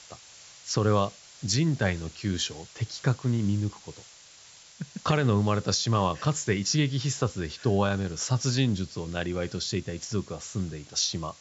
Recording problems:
high frequencies cut off; noticeable; nothing above 8 kHz
hiss; faint; throughout; 20 dB below the speech

